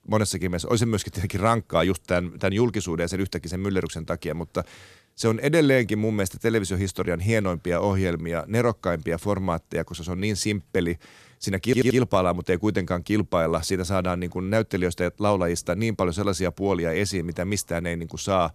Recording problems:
audio stuttering; at 12 s

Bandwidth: 14.5 kHz